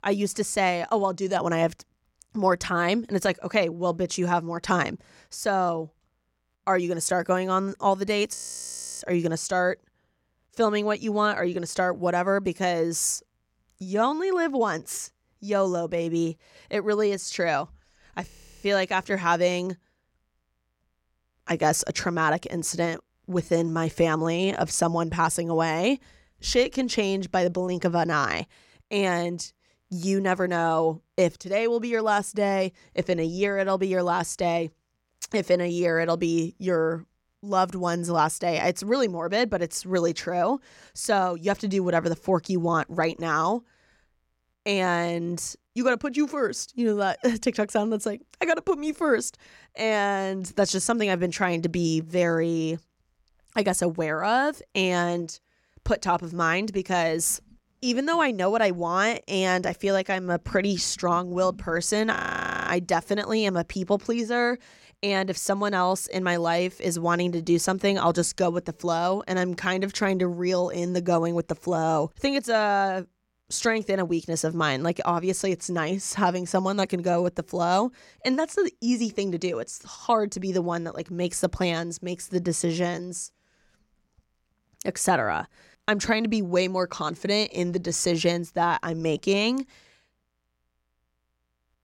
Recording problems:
audio freezing; at 8.5 s for 0.5 s, at 18 s and at 1:02 for 0.5 s

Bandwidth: 16.5 kHz